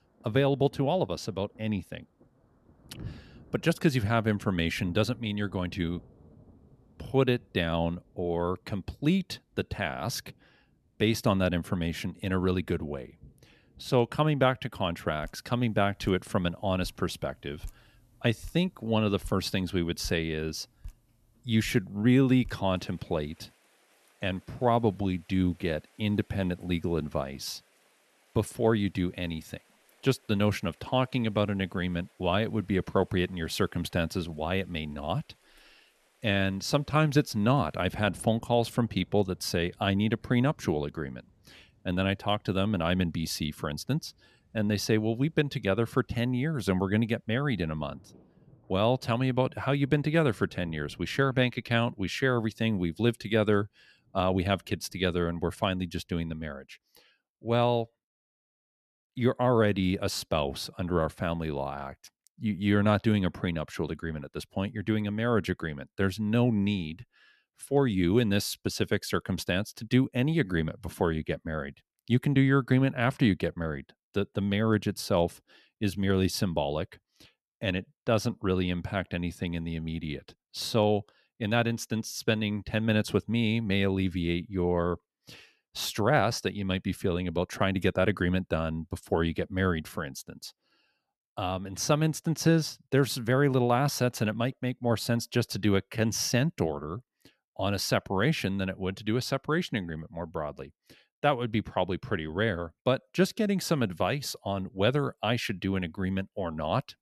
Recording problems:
rain or running water; faint; until 56 s; 25 dB below the speech

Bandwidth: 13.5 kHz